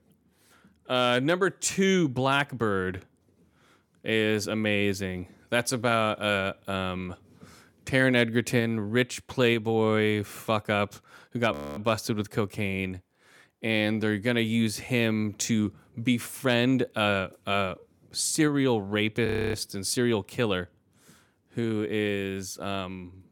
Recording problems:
audio freezing; at 12 s and at 19 s

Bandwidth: 18 kHz